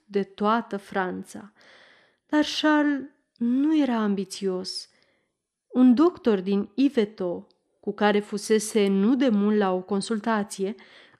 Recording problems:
none

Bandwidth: 14 kHz